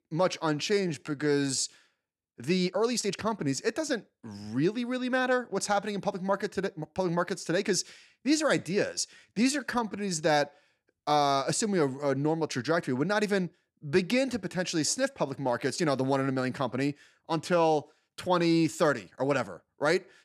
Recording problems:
uneven, jittery; strongly; from 0.5 to 10 s

